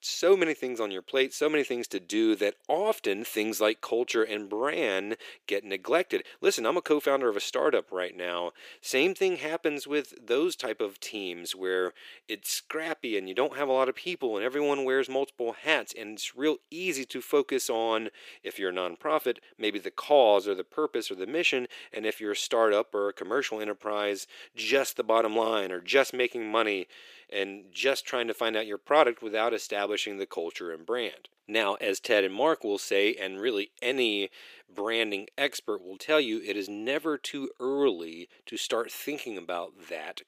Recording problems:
thin; very; fading below 350 Hz

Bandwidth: 15 kHz